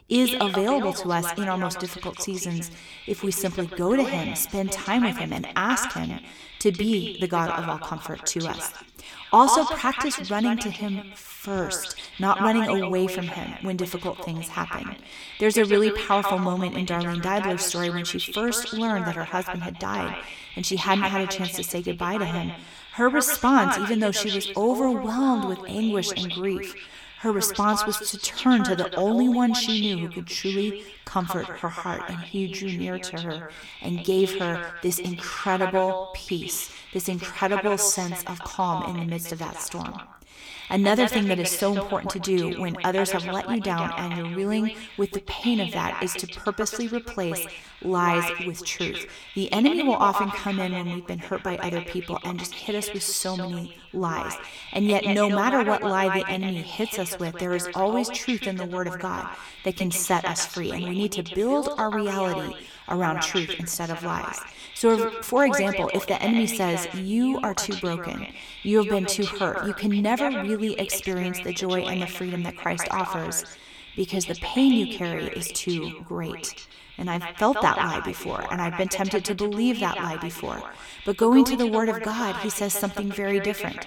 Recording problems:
echo of what is said; strong; throughout; 140 ms later, 7 dB below the speech

